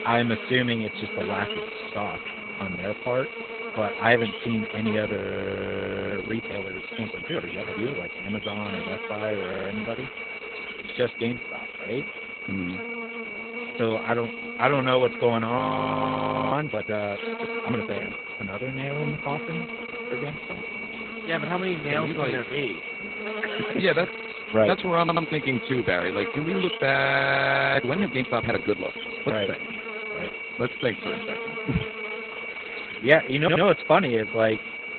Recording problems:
garbled, watery; badly; nothing above 4 kHz
high-pitched whine; loud; throughout; 2.5 kHz, 7 dB below the speech
electrical hum; noticeable; throughout; 50 Hz, 10 dB below the speech
audio freezing; at 5 s for 1 s, at 16 s for 1 s and at 27 s for 1 s
audio stuttering; 4 times, first at 9.5 s

